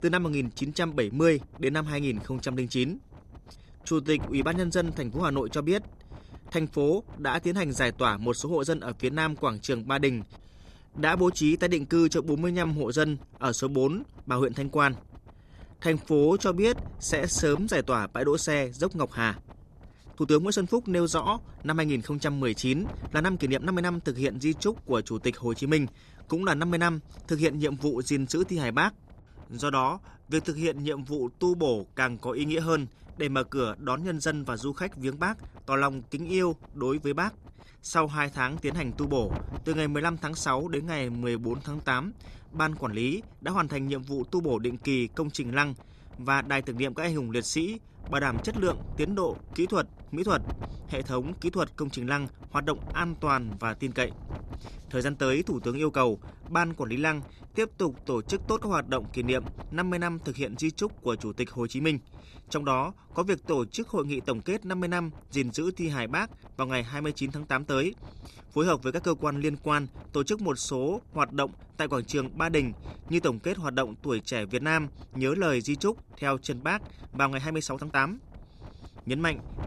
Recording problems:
wind noise on the microphone; occasional gusts; 25 dB below the speech
uneven, jittery; strongly; from 3.5 s to 1:18

